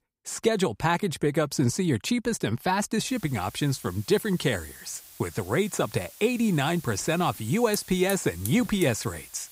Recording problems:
hiss; noticeable; from 3 s on; 15 dB below the speech

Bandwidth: 15.5 kHz